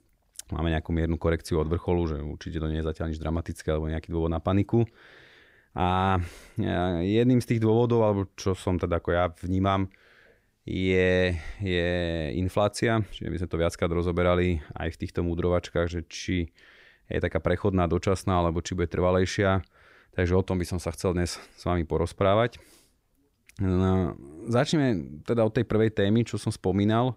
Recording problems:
none

